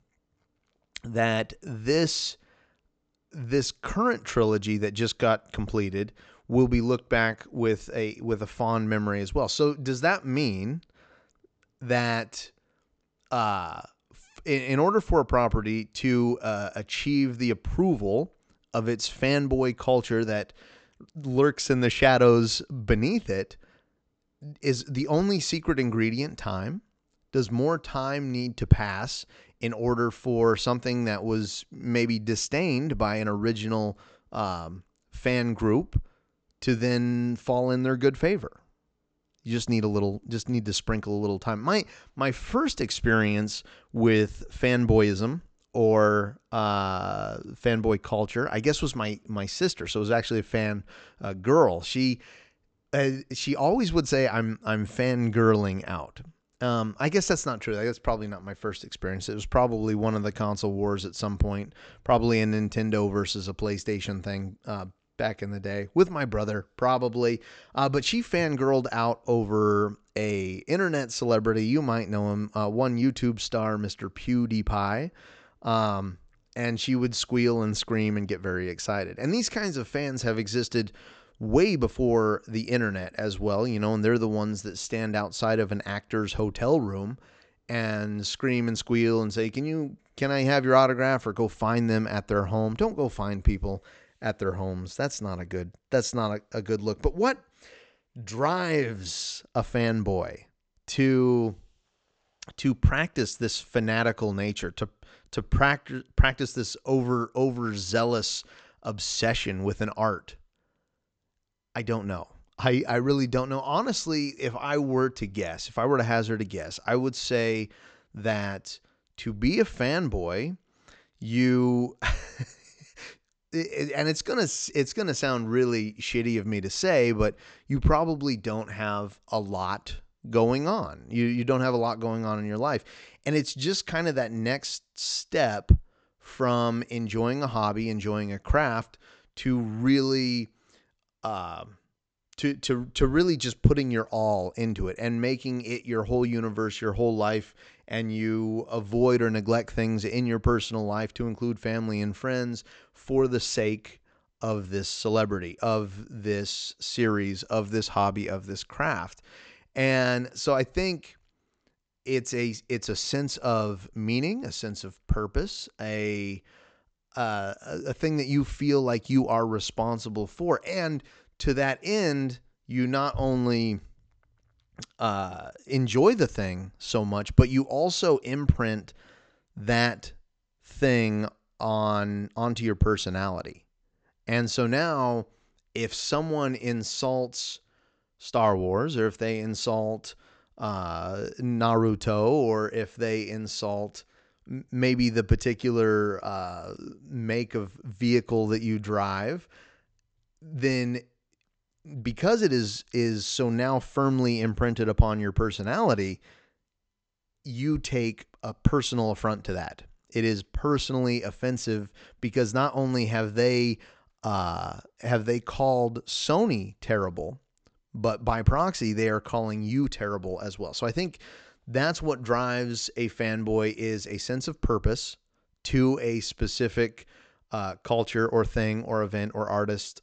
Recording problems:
high frequencies cut off; noticeable; nothing above 8 kHz

